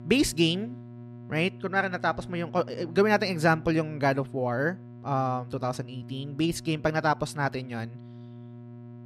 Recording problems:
electrical hum; faint; throughout; 60 Hz, 25 dB below the speech

